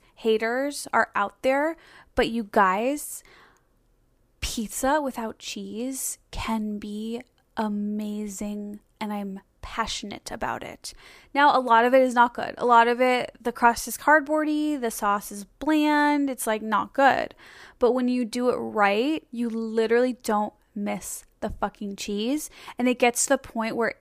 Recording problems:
none

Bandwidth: 15 kHz